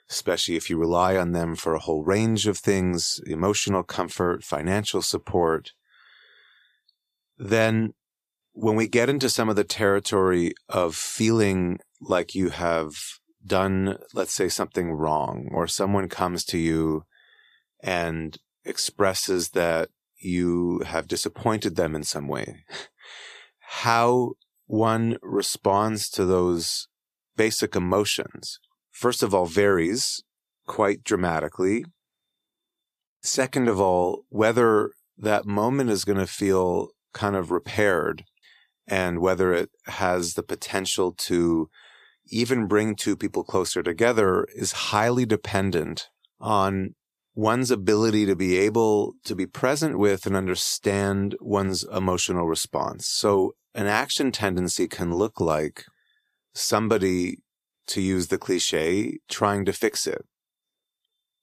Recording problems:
none

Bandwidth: 14.5 kHz